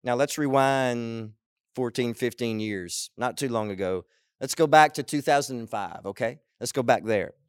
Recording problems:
none

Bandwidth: 16.5 kHz